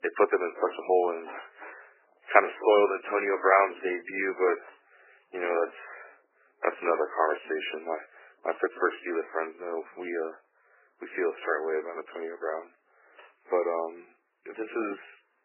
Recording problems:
garbled, watery; badly; nothing above 3 kHz
thin; very; fading below 400 Hz

